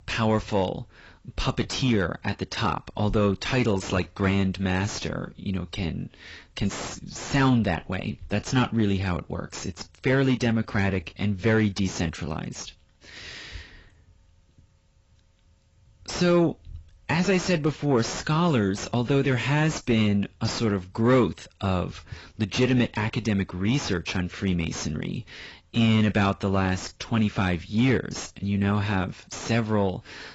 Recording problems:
garbled, watery; badly; nothing above 7.5 kHz
distortion; slight; 9 dB below the speech

